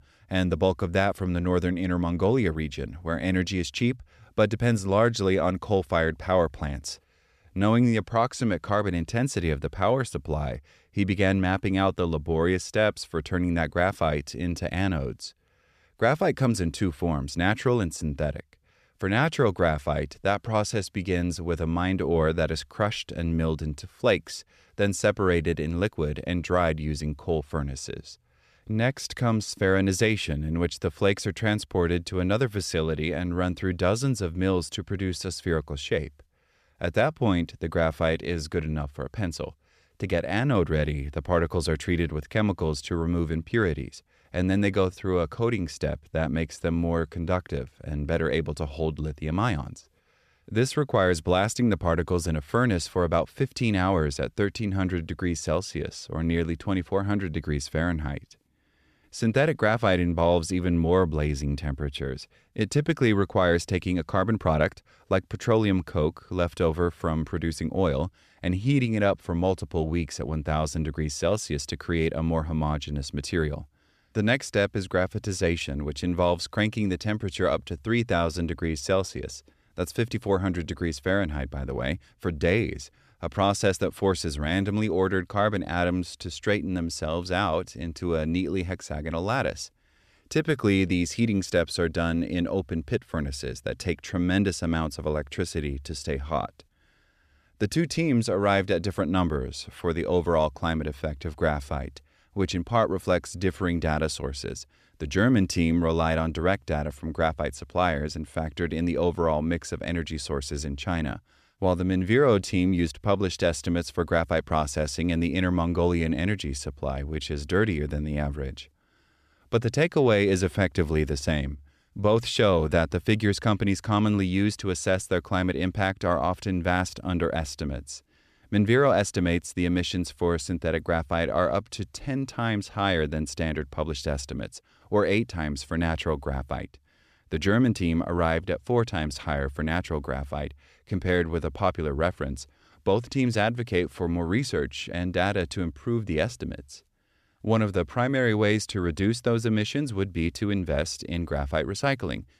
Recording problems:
none

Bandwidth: 14.5 kHz